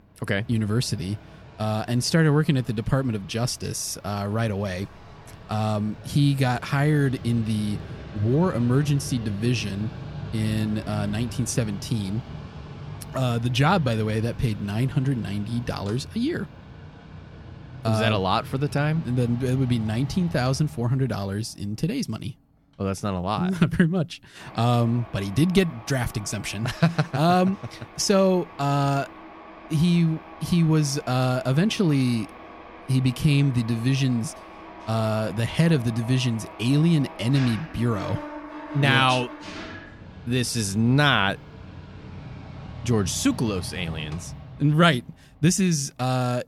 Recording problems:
machinery noise; noticeable; throughout; 15 dB below the speech

